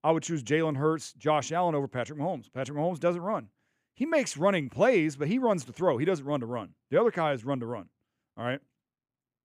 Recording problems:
none

